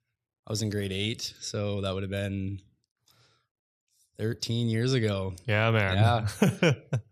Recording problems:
none

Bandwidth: 14.5 kHz